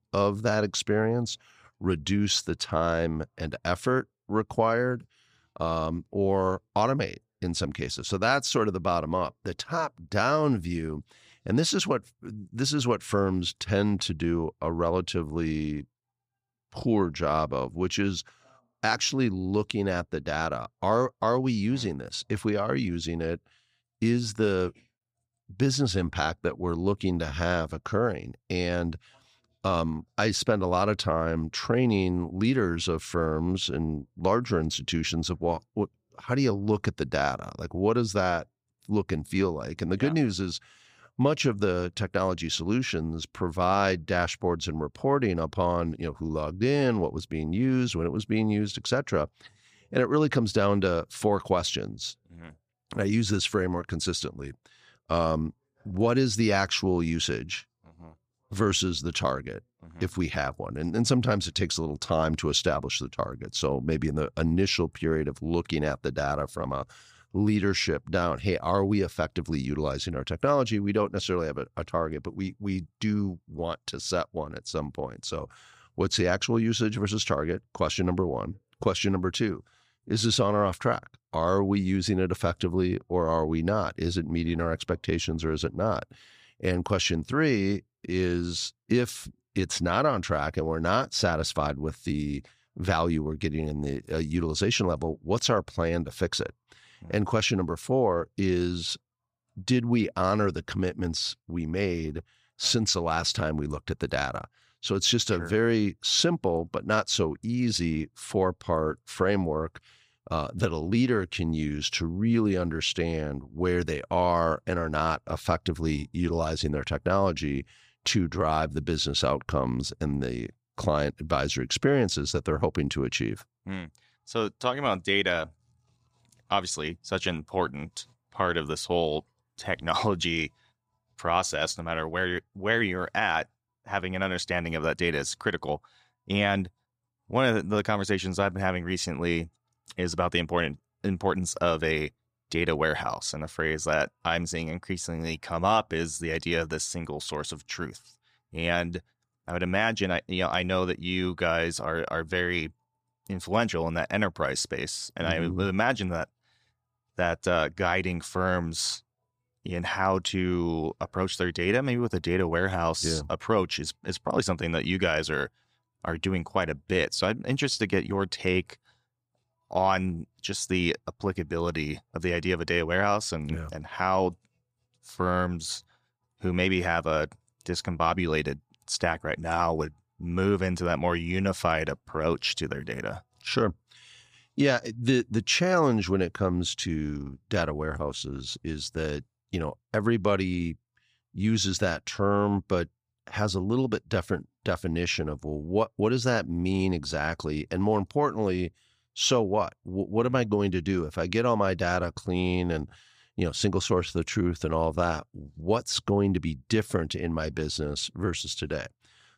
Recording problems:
none

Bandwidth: 14.5 kHz